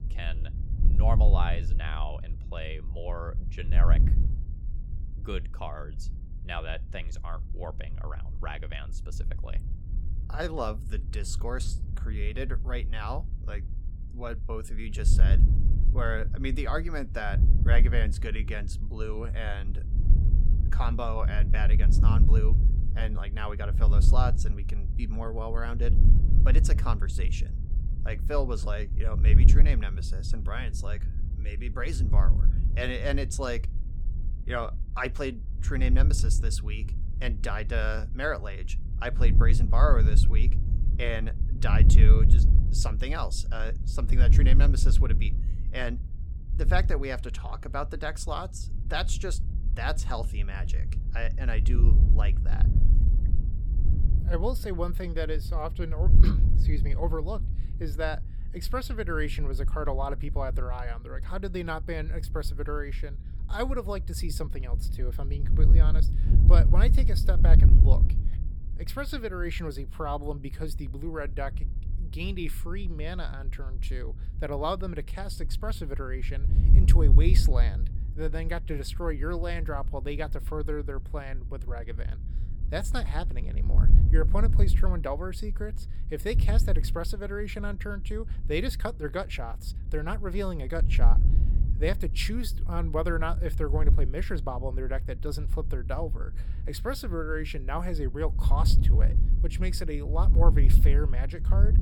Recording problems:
wind noise on the microphone; occasional gusts; 10 dB below the speech

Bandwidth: 18 kHz